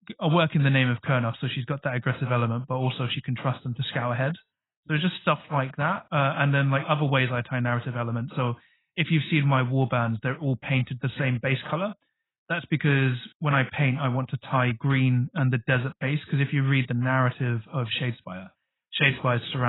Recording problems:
garbled, watery; badly; nothing above 4 kHz
abrupt cut into speech; at the end

